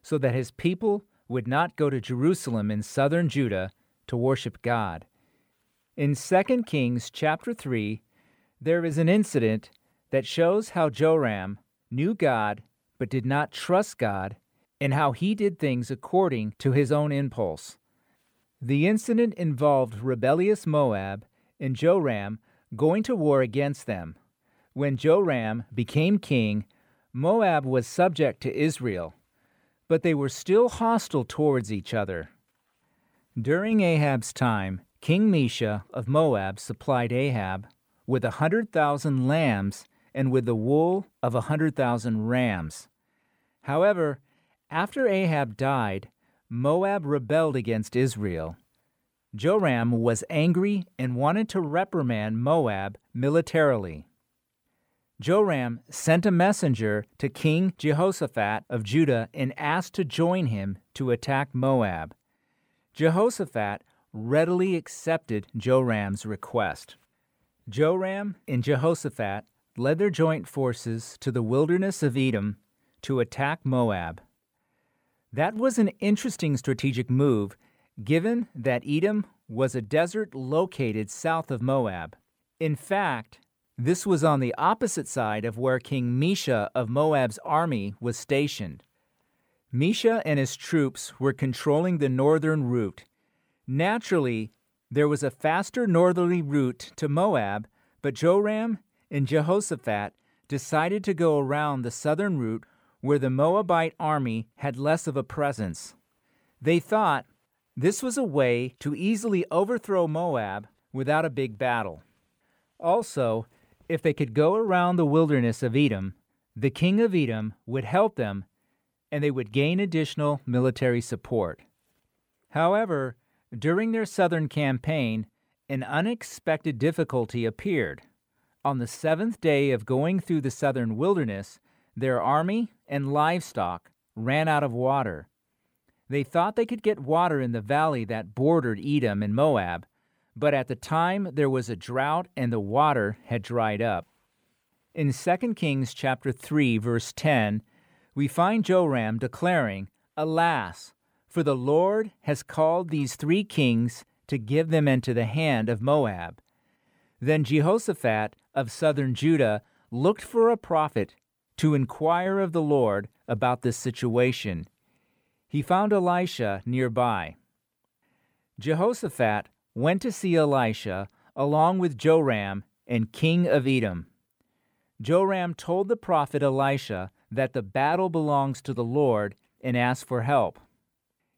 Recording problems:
none

